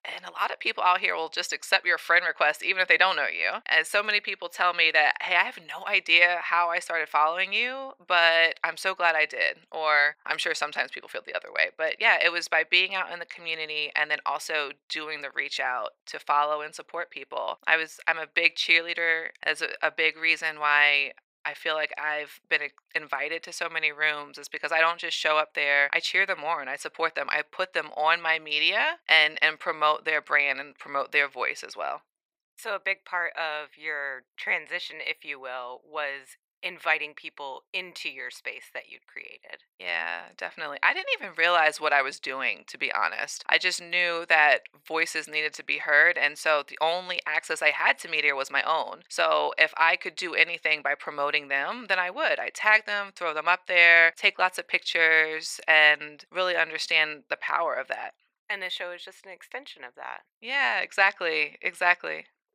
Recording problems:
thin; very; fading below 700 Hz

